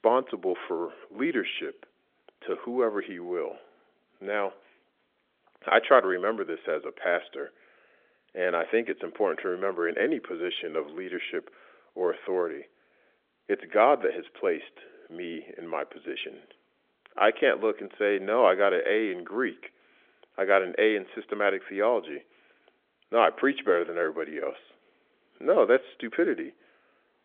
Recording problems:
phone-call audio; nothing above 3.5 kHz

